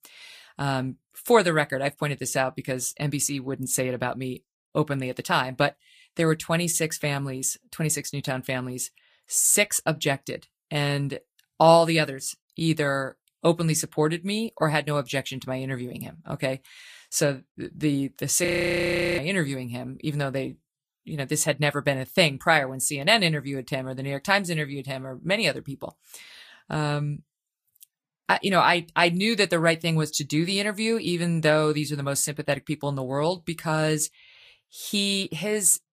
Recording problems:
garbled, watery; slightly; nothing above 15 kHz
audio freezing; at 18 s for 0.5 s

